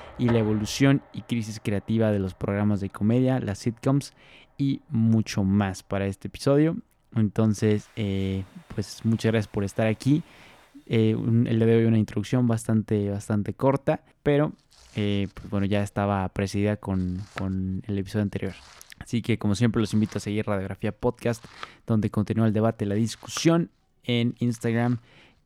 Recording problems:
household noises; faint; throughout; 20 dB below the speech

